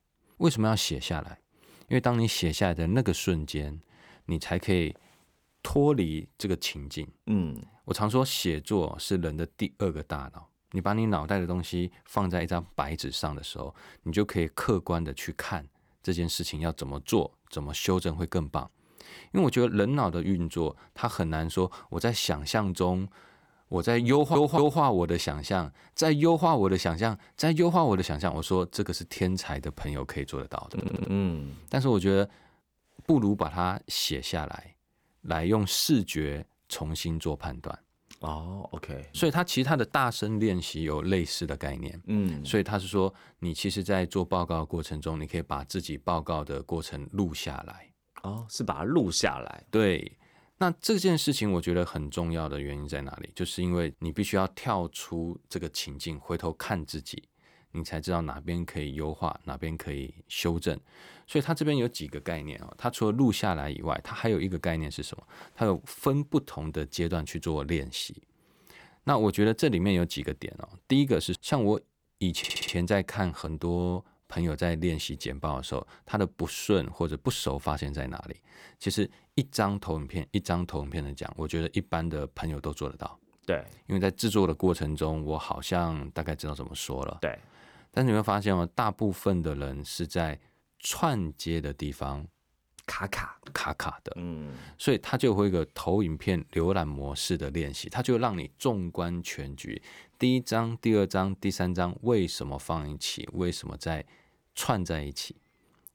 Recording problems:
audio stuttering; at 24 s, at 31 s and at 1:12

